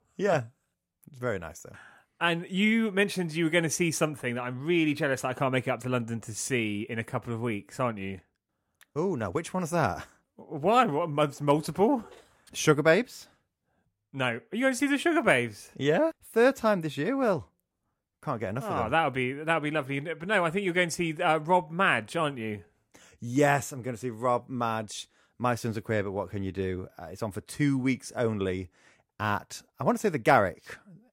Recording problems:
none

